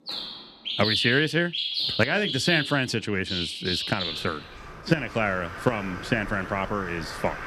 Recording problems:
animal sounds; loud; throughout; 4 dB below the speech
household noises; faint; throughout; 30 dB below the speech

